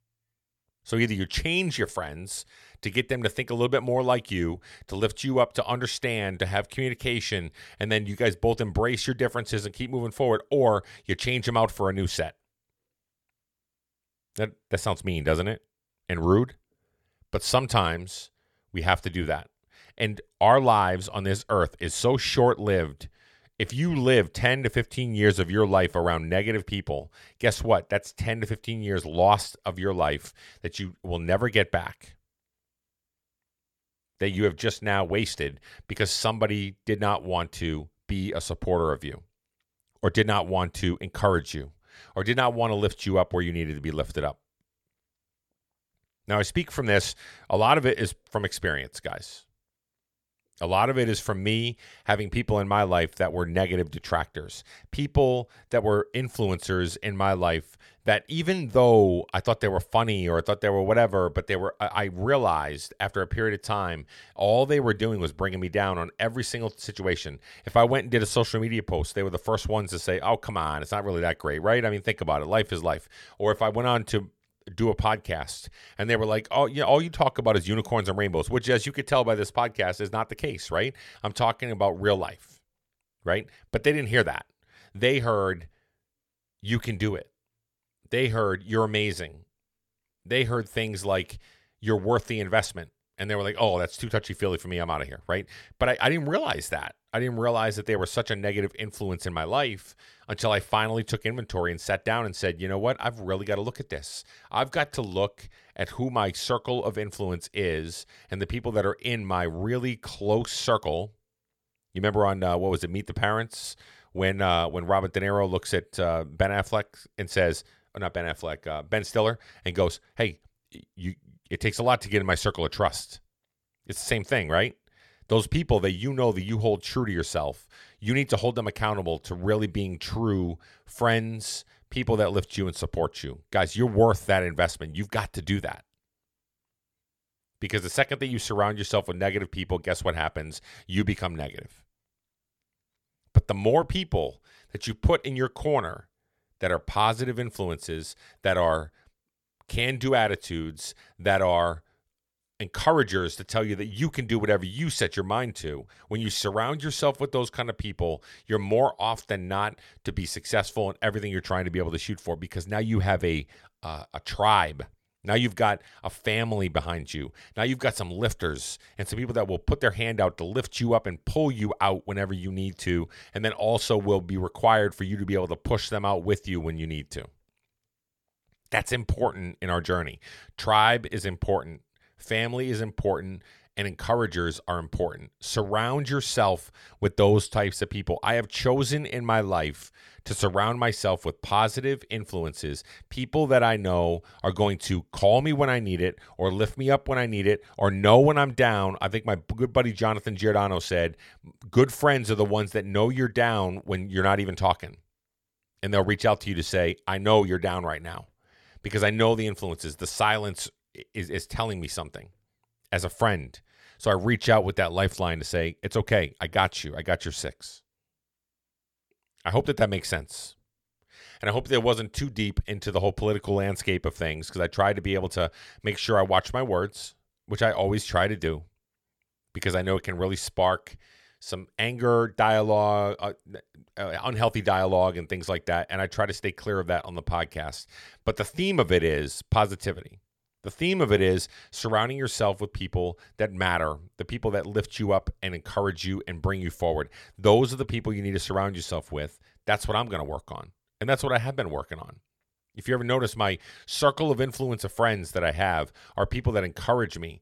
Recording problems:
none

